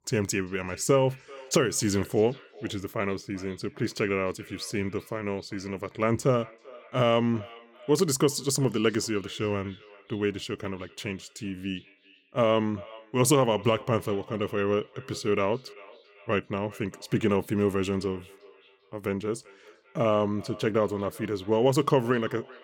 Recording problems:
echo of what is said; faint; throughout; 390 ms later, 20 dB below the speech

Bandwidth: 18 kHz